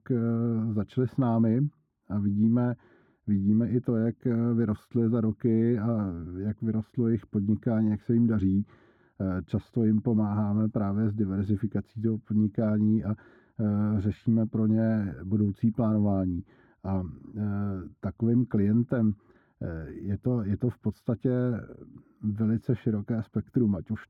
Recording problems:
muffled; very; fading above 2 kHz

